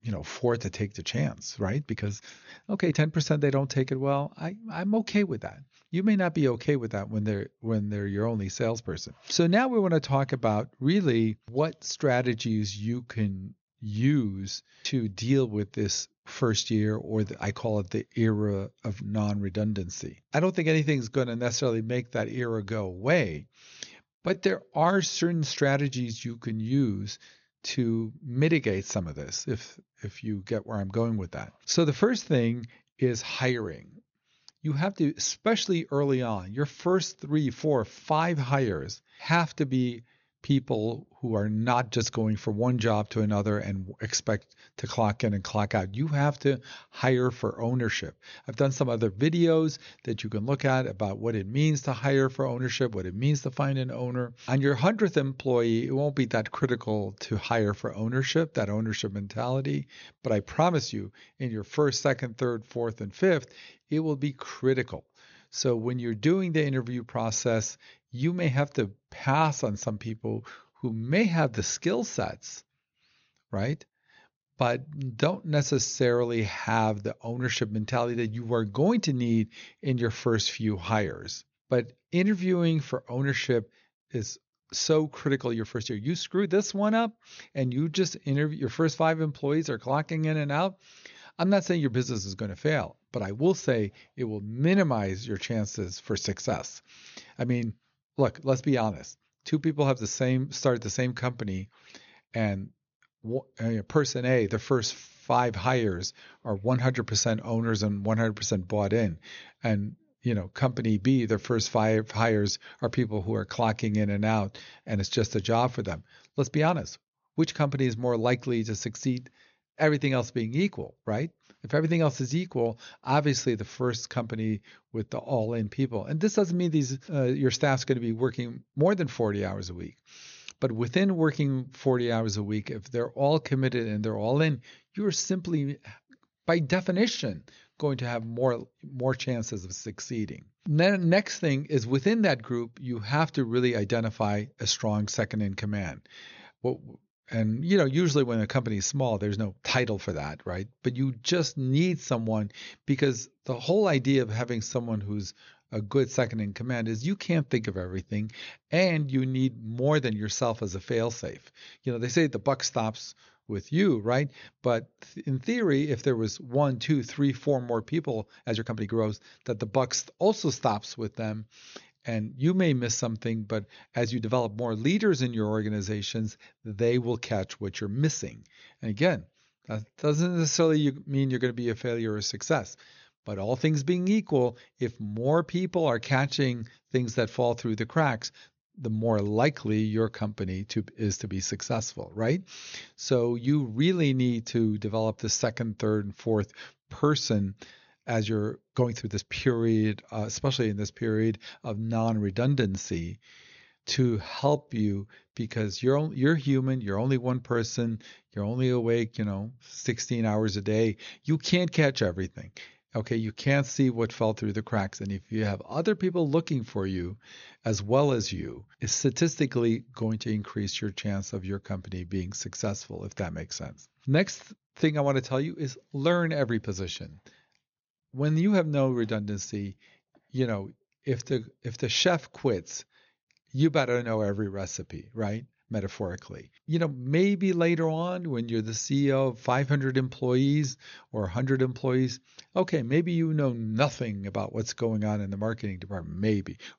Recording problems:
high frequencies cut off; noticeable; nothing above 7 kHz
uneven, jittery; strongly; from 2 s to 3:51

